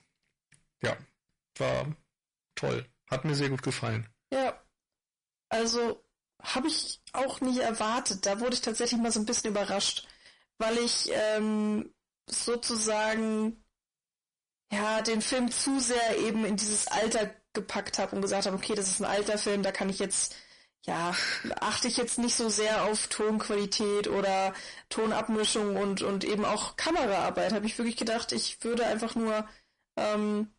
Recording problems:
distortion; heavy; 20% of the sound clipped
garbled, watery; slightly; nothing above 10 kHz

